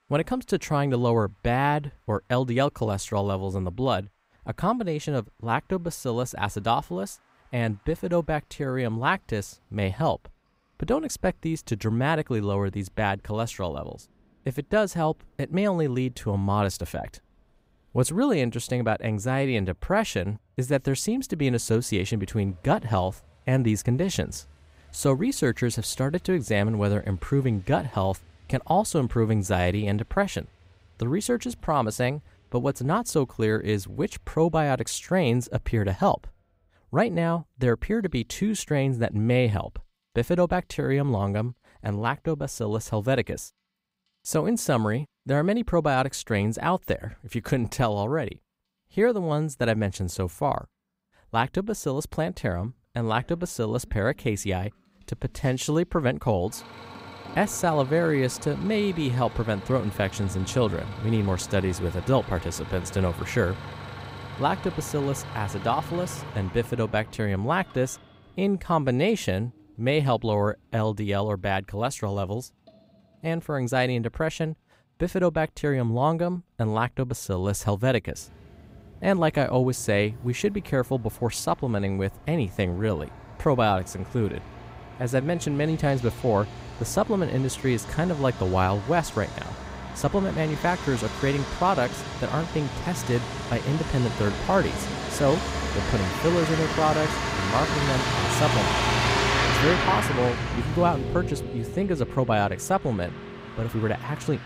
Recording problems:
traffic noise; loud; throughout; 5 dB below the speech

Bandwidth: 15.5 kHz